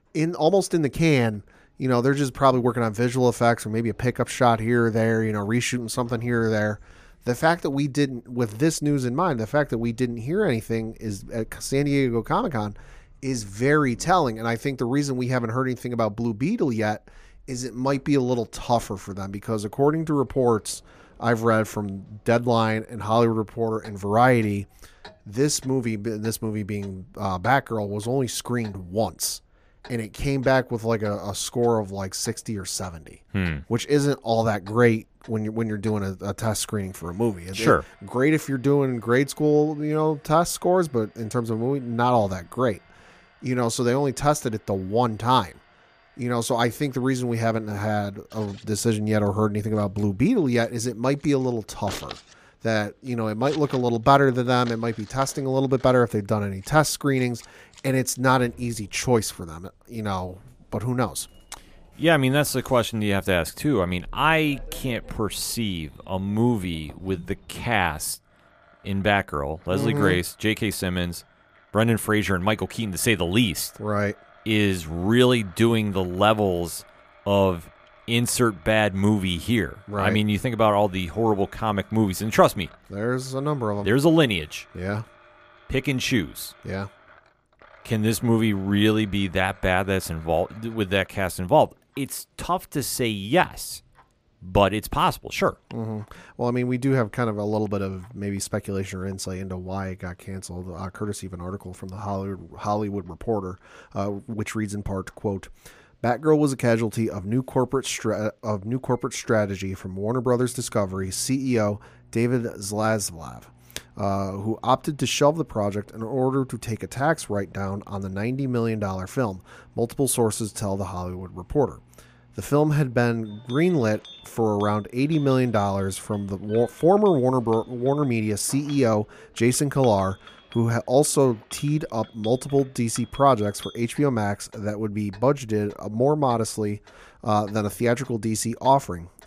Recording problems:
household noises; faint; throughout; 25 dB below the speech

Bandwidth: 15 kHz